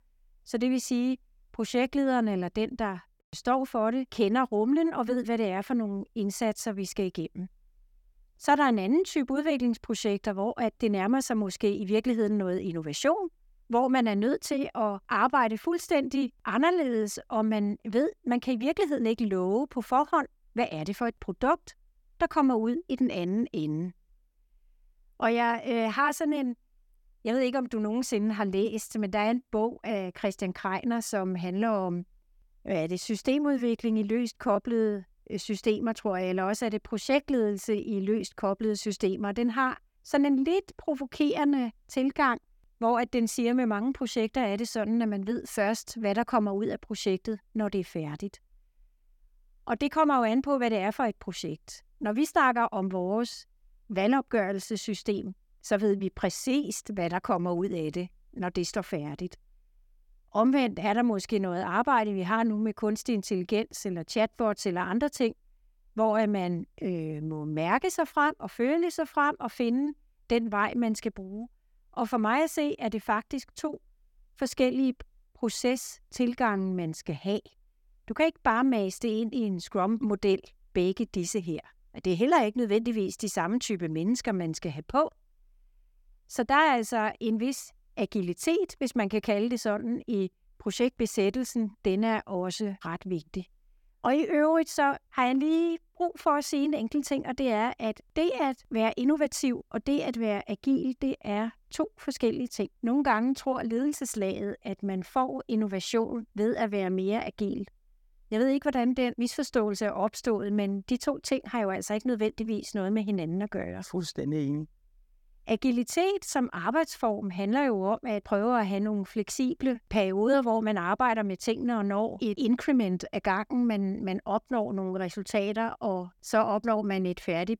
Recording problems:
none

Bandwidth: 17.5 kHz